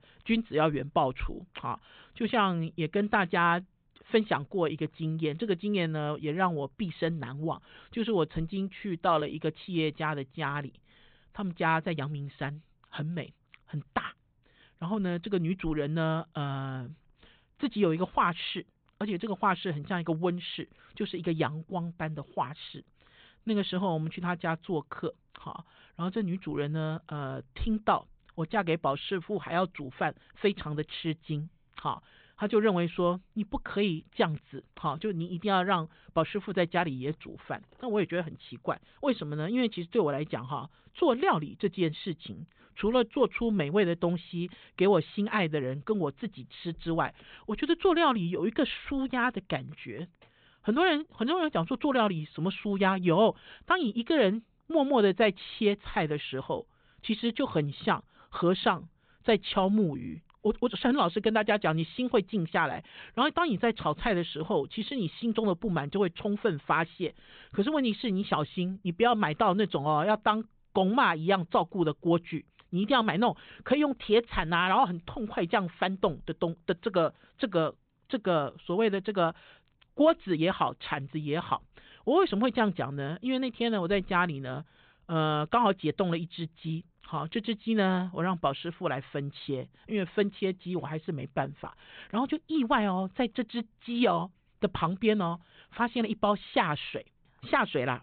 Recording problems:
high frequencies cut off; severe; nothing above 4 kHz

